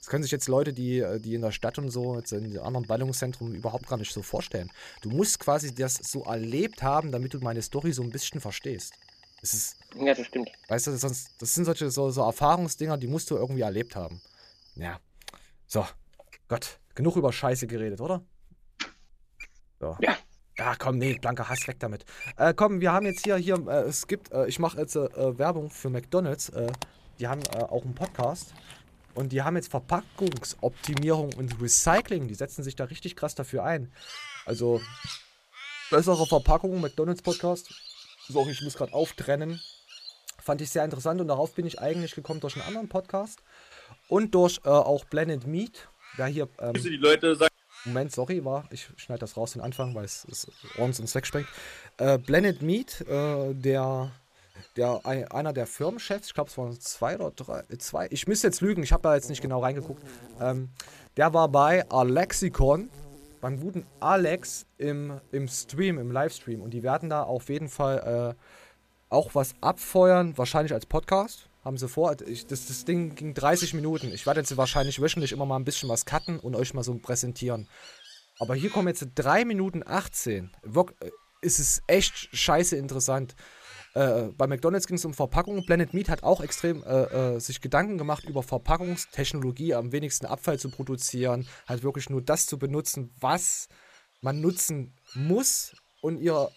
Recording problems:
animal sounds; noticeable; throughout; 15 dB below the speech

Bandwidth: 14.5 kHz